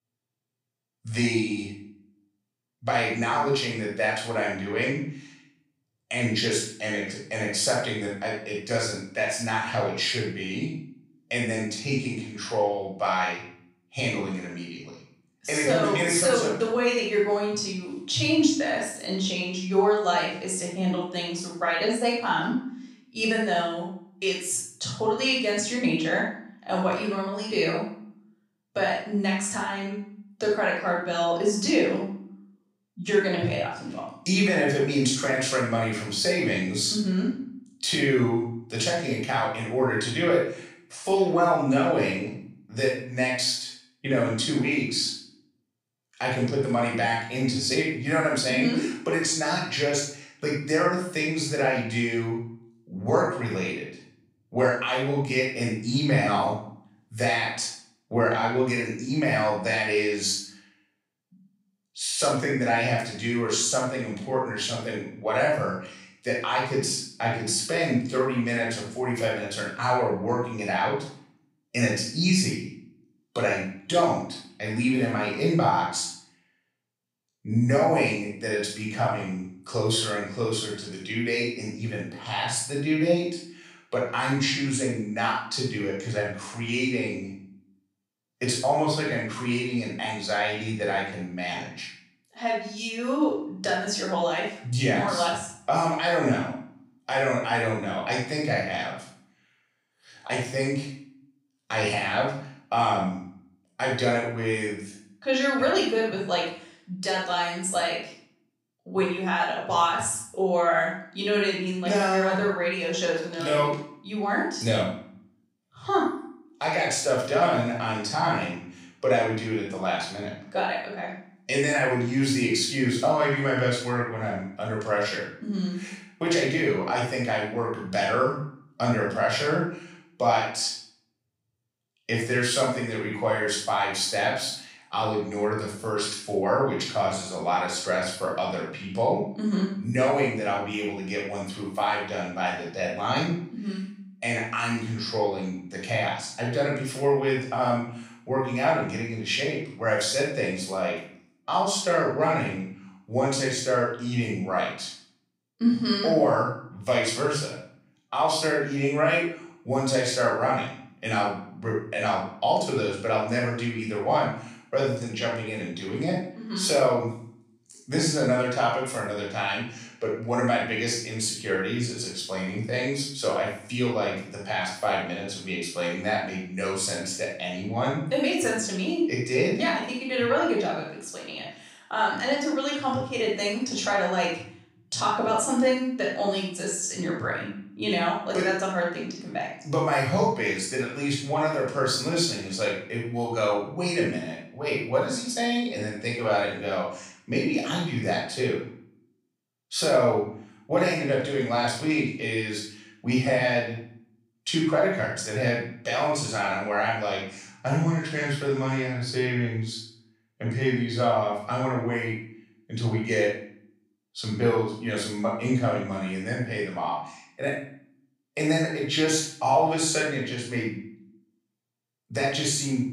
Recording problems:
off-mic speech; far
room echo; noticeable; dies away in 0.5 s

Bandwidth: 15.5 kHz